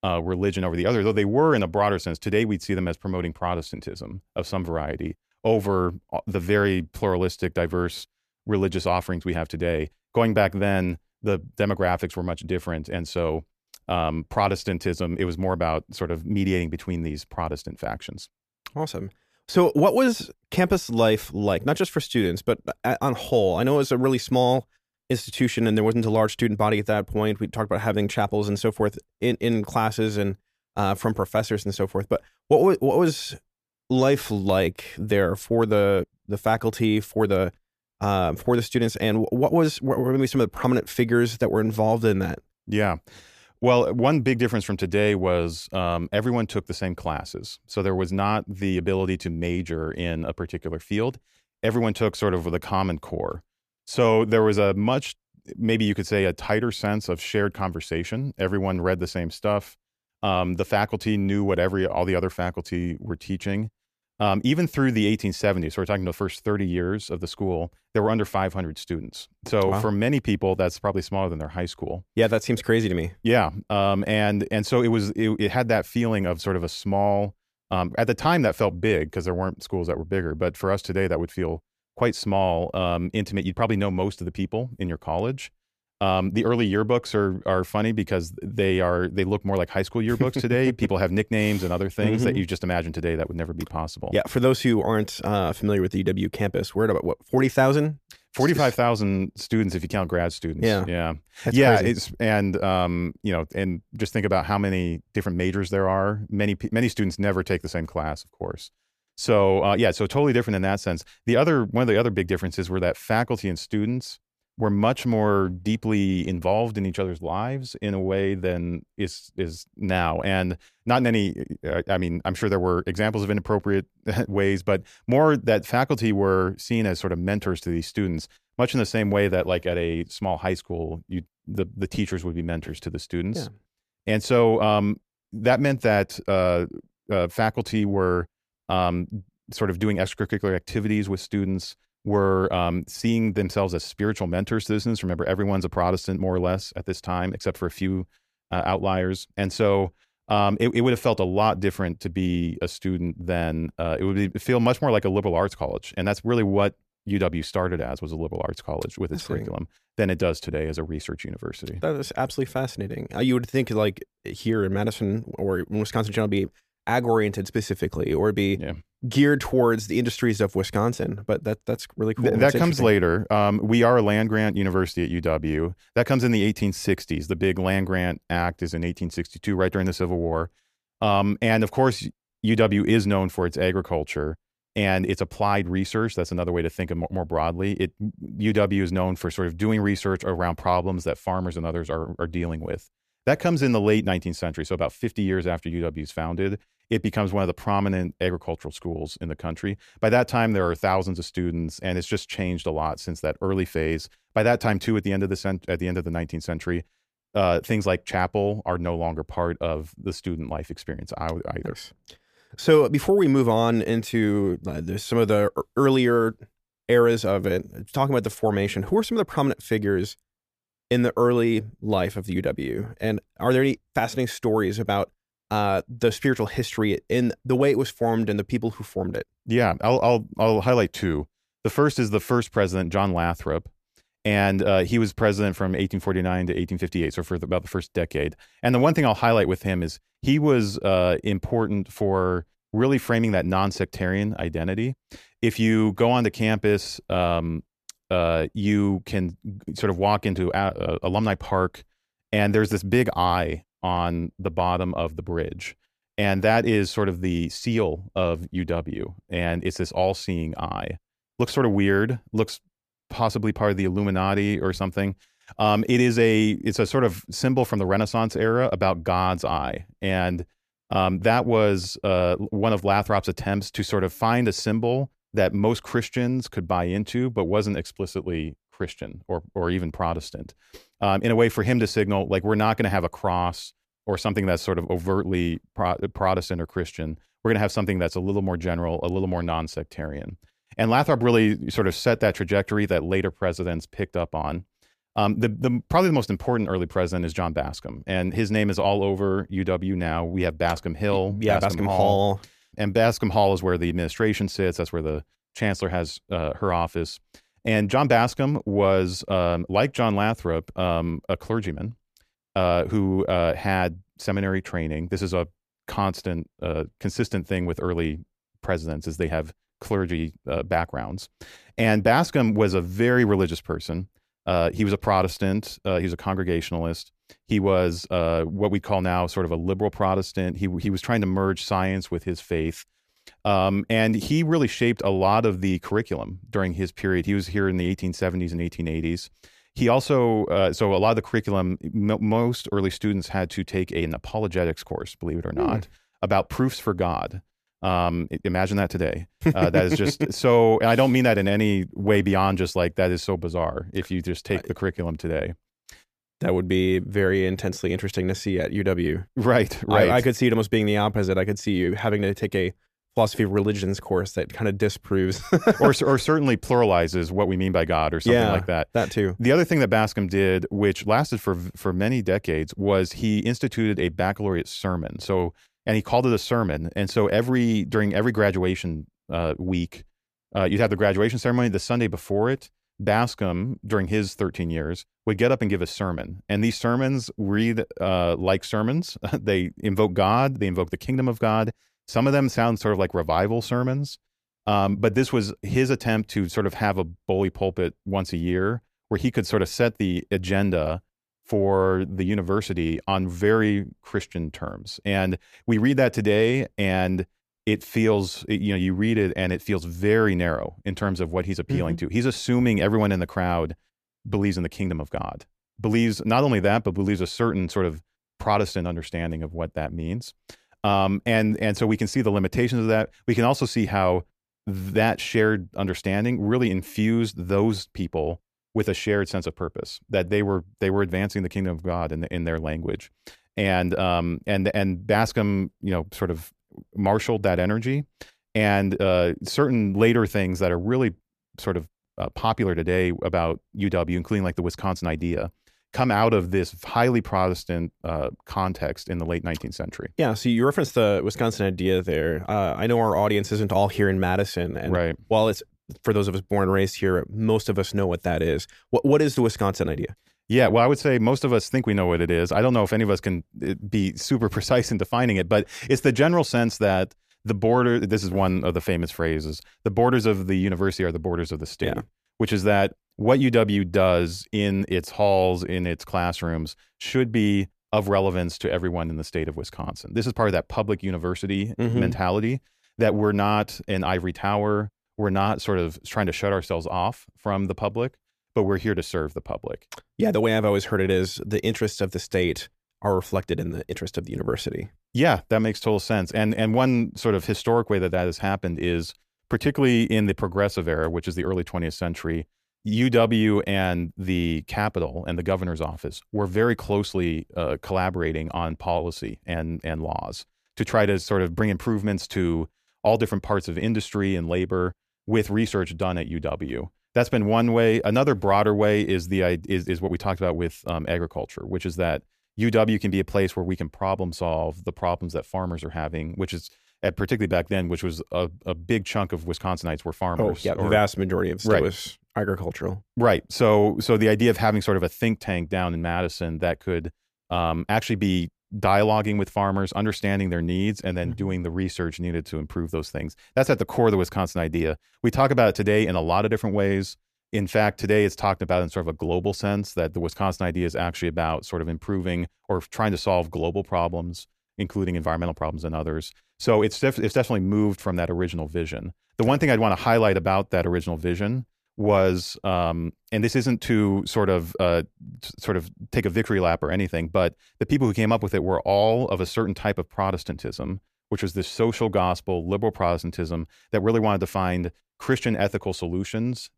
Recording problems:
none

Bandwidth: 14.5 kHz